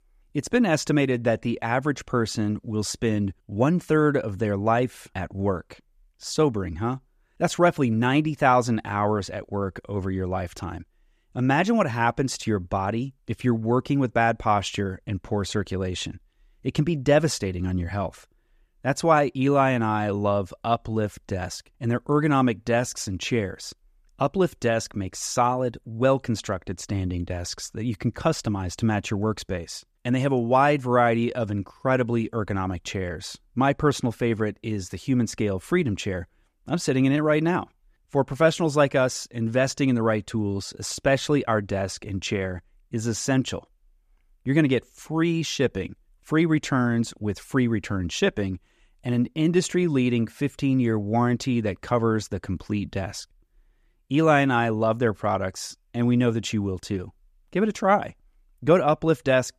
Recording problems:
none

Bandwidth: 14.5 kHz